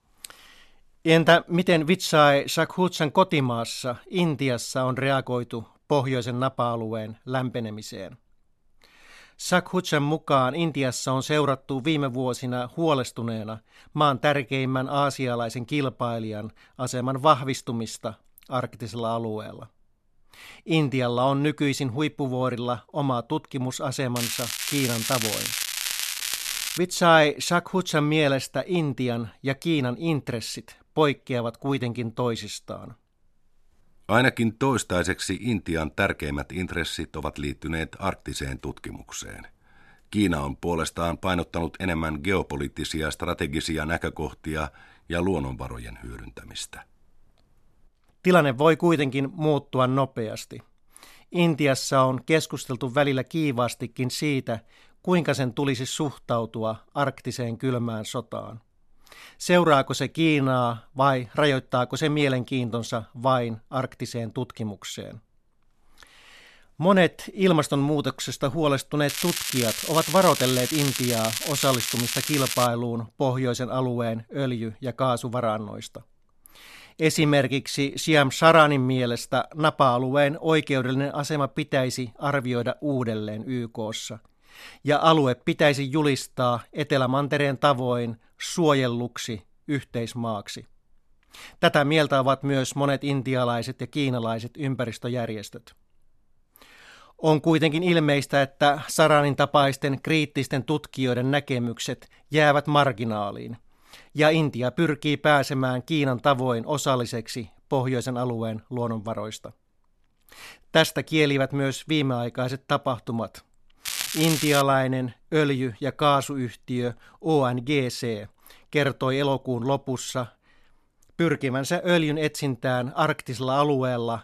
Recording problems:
crackling; loud; from 24 to 27 s, from 1:09 to 1:13 and at 1:54; 3 dB below the speech

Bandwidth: 13.5 kHz